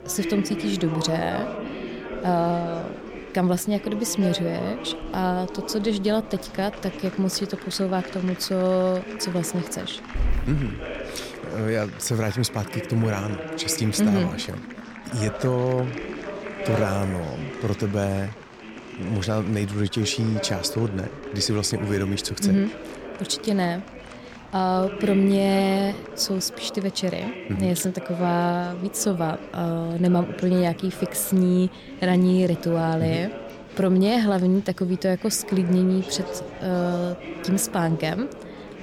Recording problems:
chatter from many people; noticeable; throughout; 10 dB below the speech
animal sounds; faint; throughout; 20 dB below the speech

